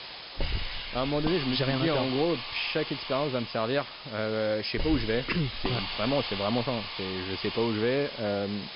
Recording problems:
high frequencies cut off; noticeable; nothing above 5.5 kHz
hiss; loud; throughout; 6 dB below the speech

